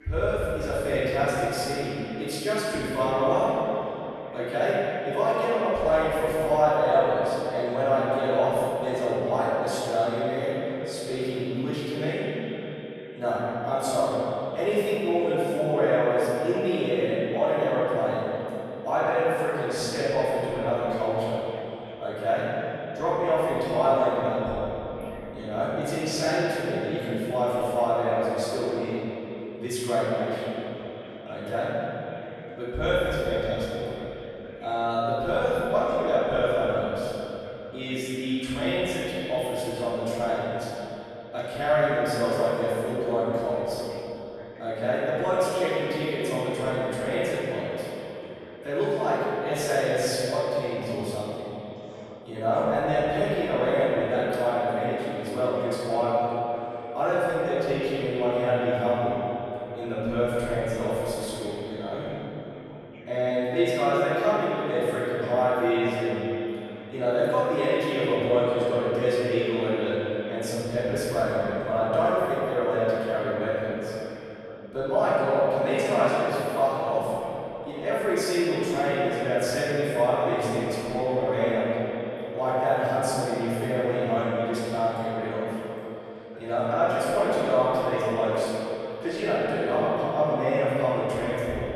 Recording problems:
echo of what is said; strong; throughout; 190 ms later, 10 dB below the speech
room echo; strong; dies away in 2.9 s
off-mic speech; far
voice in the background; faint; throughout; 20 dB below the speech

